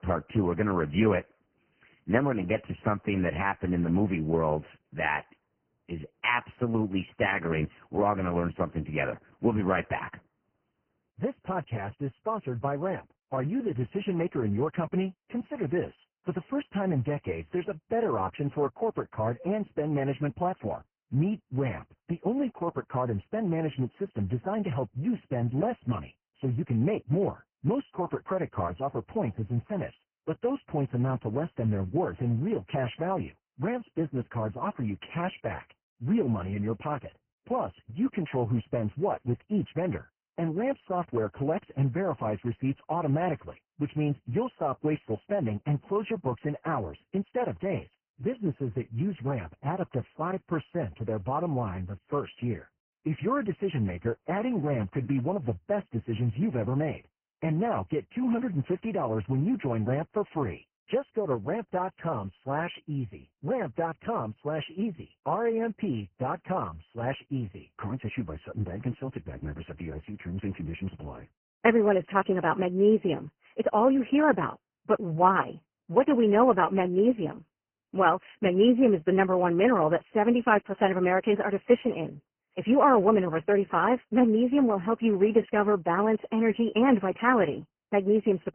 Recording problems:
garbled, watery; badly
high frequencies cut off; severe; nothing above 3 kHz

